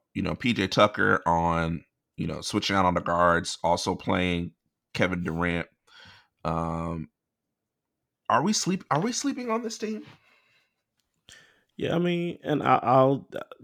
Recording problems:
none

